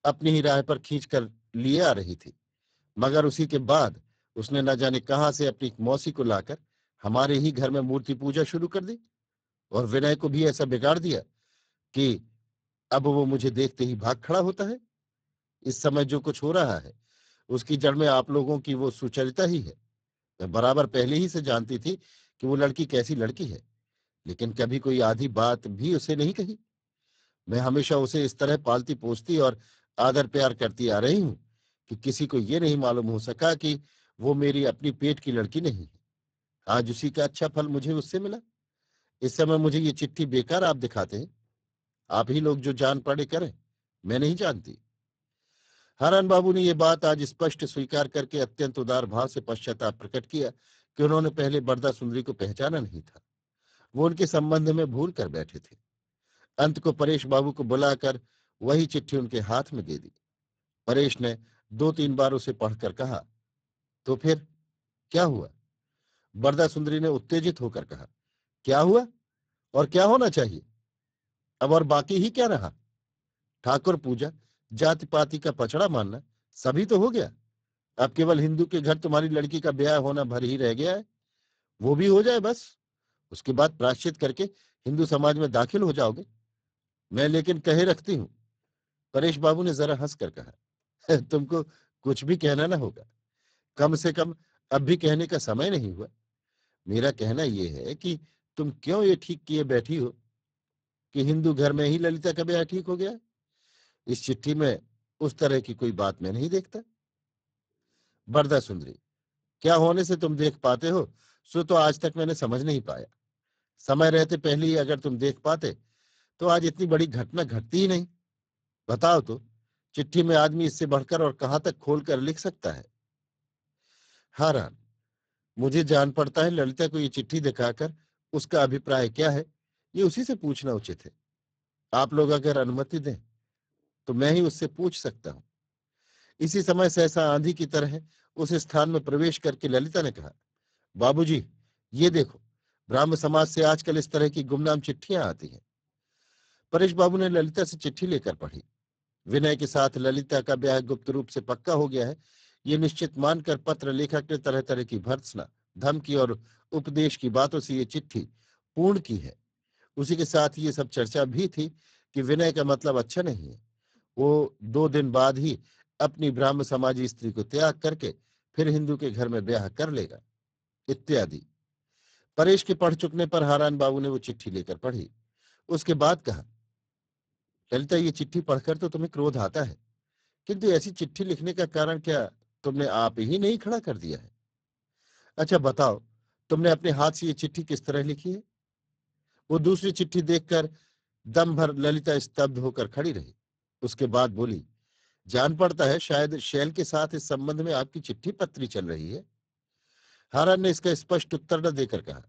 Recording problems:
garbled, watery; badly; nothing above 7.5 kHz

